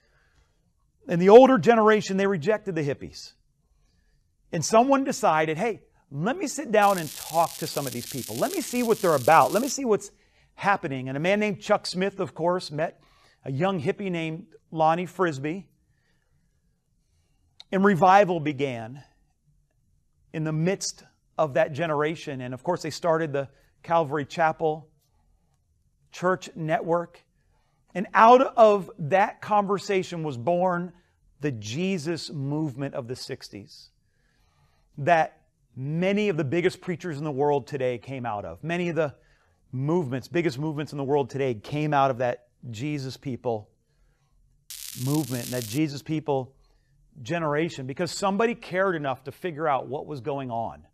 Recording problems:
crackling; noticeable; from 7 to 9.5 s and from 45 to 46 s; 10 dB below the speech

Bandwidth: 14.5 kHz